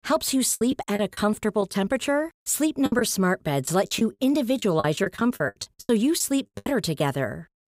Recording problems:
choppy; very; 12% of the speech affected

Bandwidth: 15.5 kHz